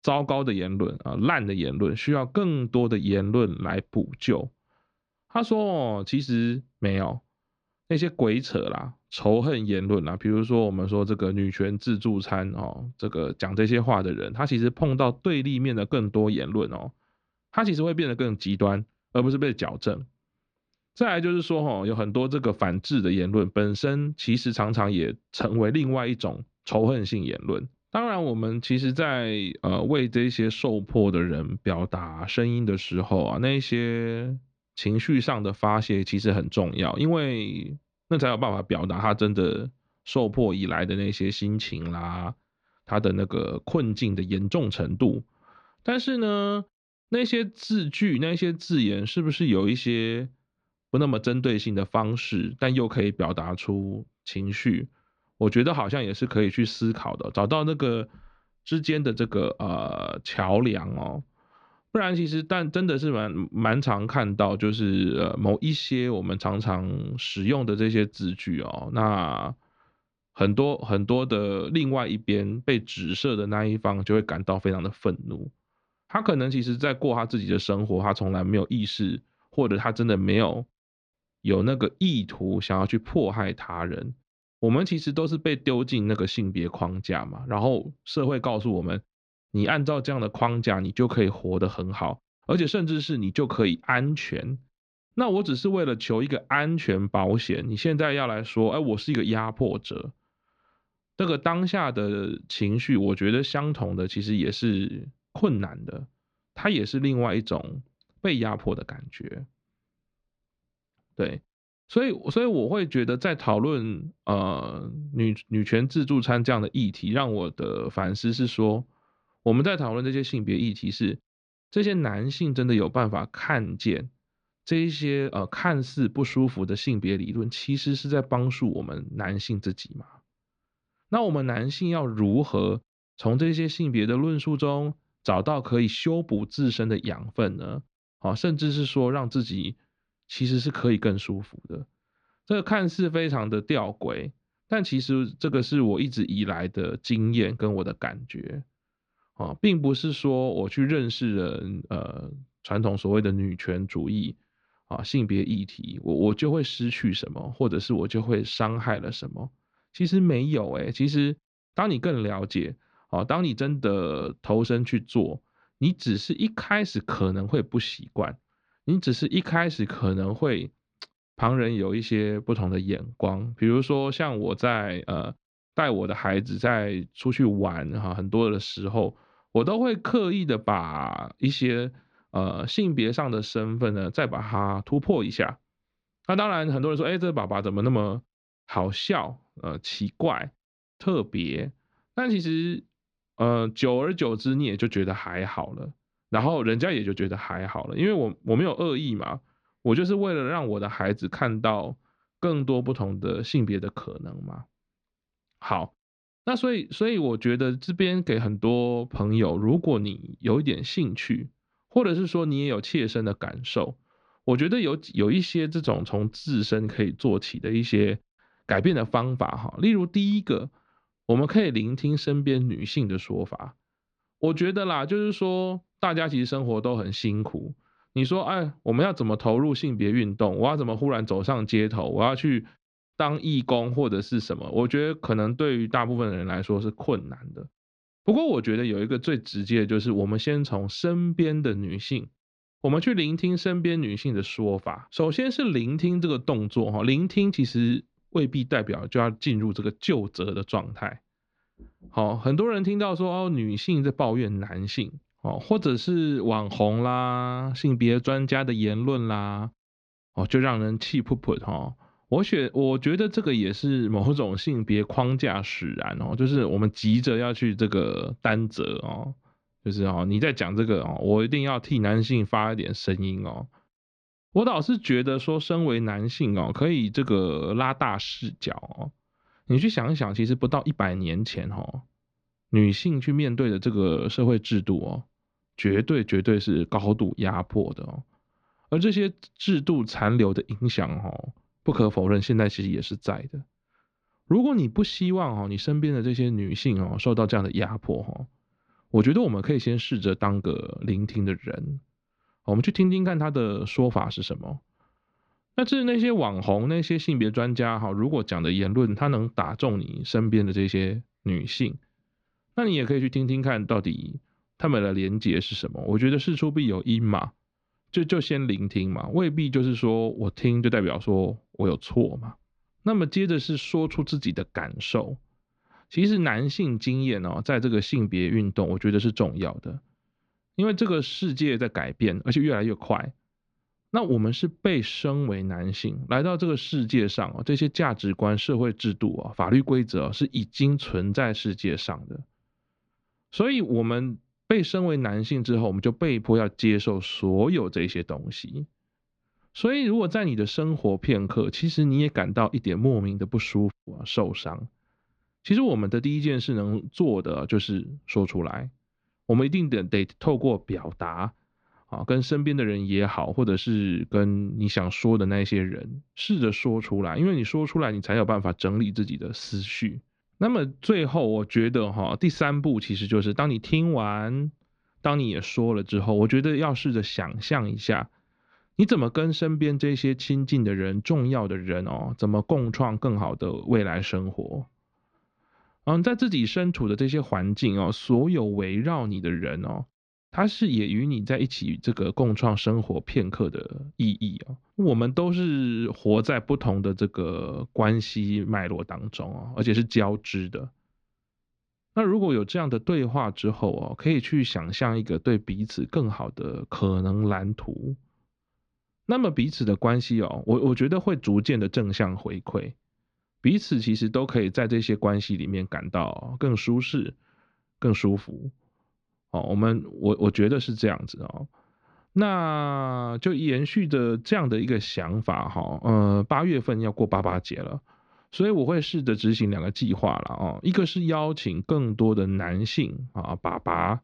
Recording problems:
muffled; very slightly; fading above 4 kHz

